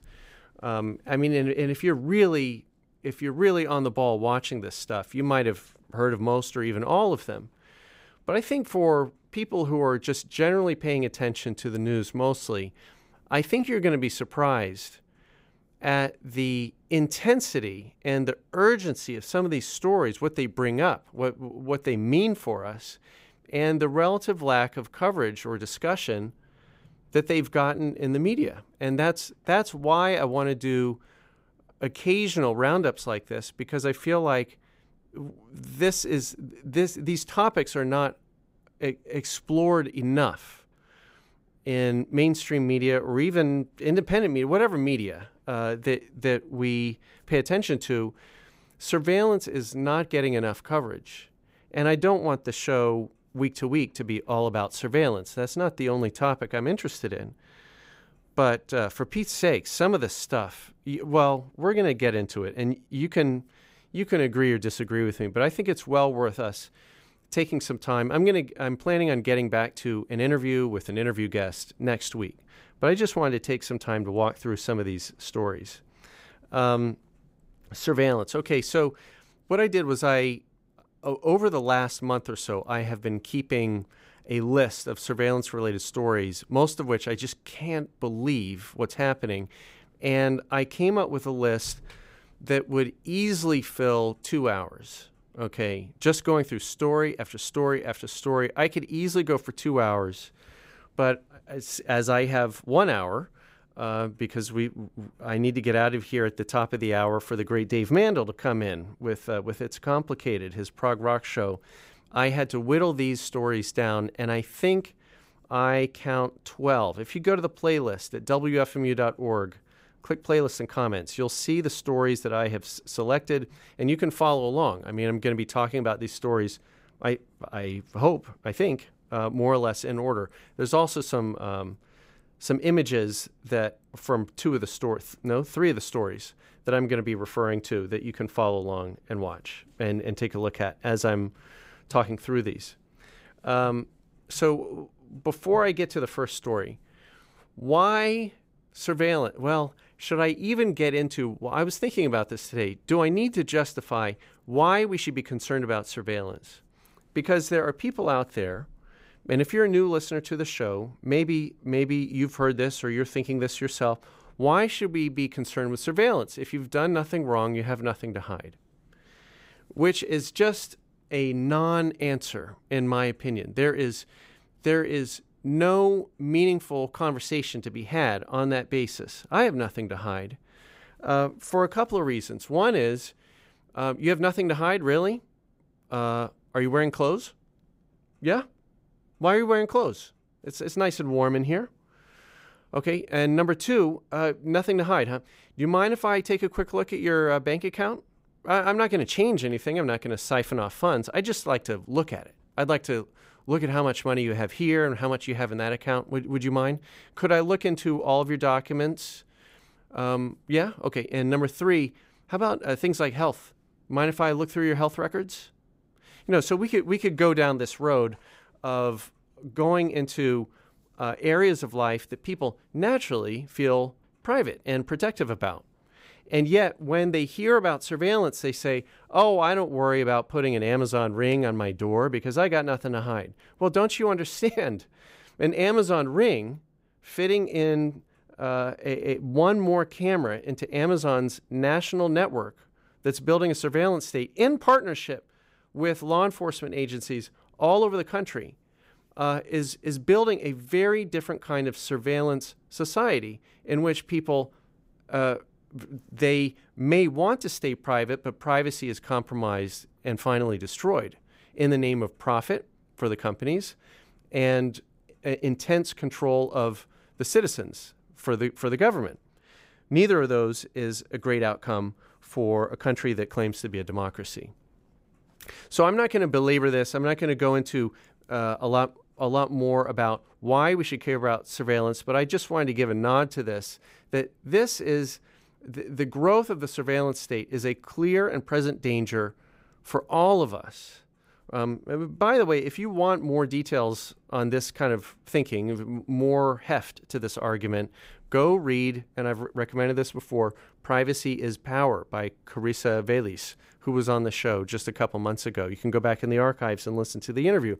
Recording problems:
none

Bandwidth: 15.5 kHz